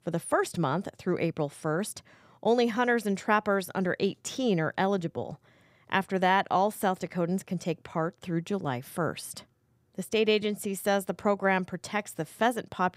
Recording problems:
none

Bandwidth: 15.5 kHz